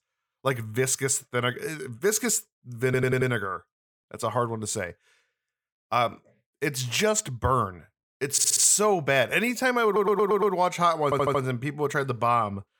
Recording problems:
audio stuttering; 4 times, first at 3 s

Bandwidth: 18 kHz